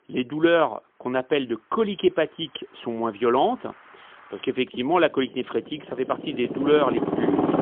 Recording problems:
phone-call audio; poor line; nothing above 3.5 kHz
traffic noise; loud; throughout; 3 dB below the speech

